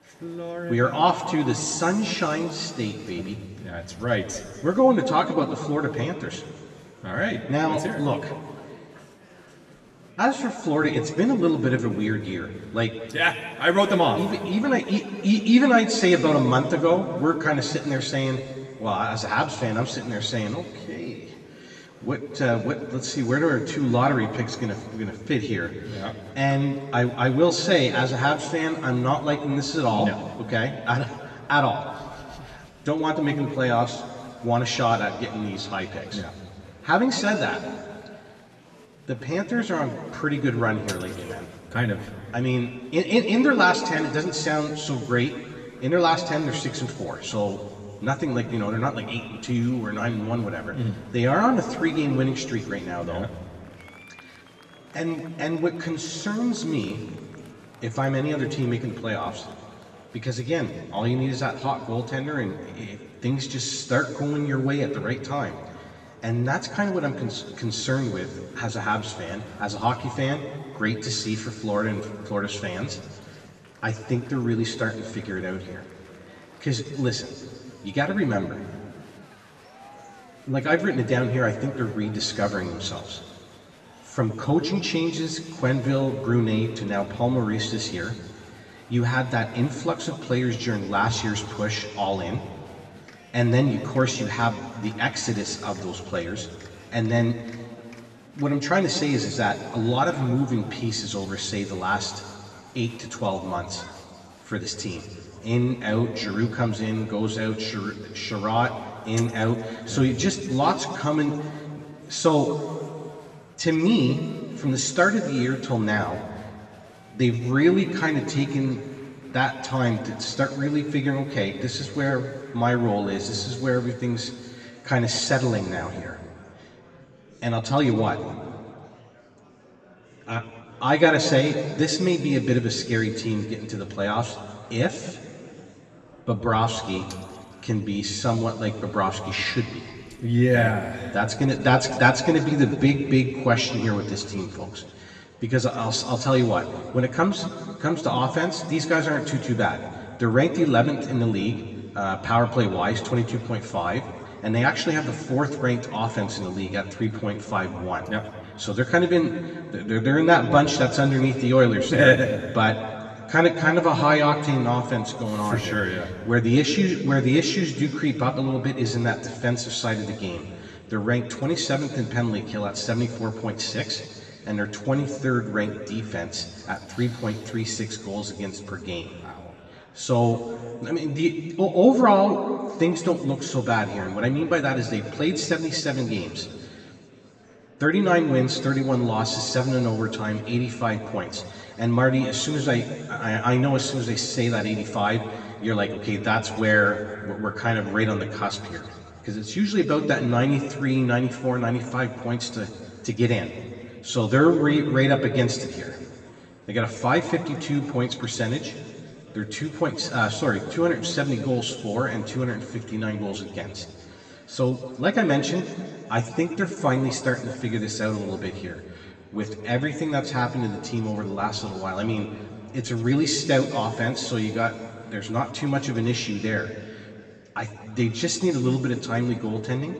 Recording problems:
off-mic speech; far
room echo; noticeable; dies away in 1.8 s
murmuring crowd; faint; throughout; 25 dB below the speech

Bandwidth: 13 kHz